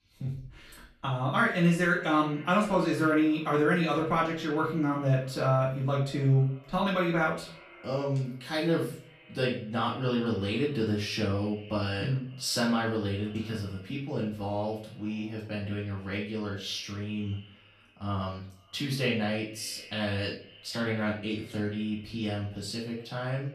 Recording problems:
off-mic speech; far
echo of what is said; faint; throughout; 230 ms later, 25 dB below the speech
room echo; slight; dies away in 0.4 s

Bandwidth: 14 kHz